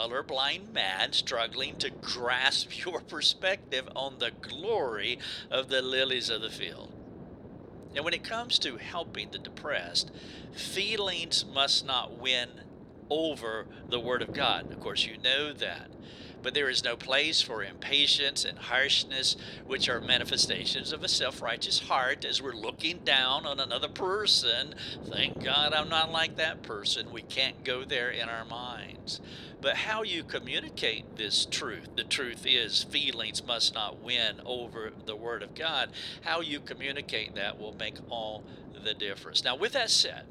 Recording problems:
thin; very; fading below 500 Hz
wind noise on the microphone; occasional gusts; 20 dB below the speech
abrupt cut into speech; at the start

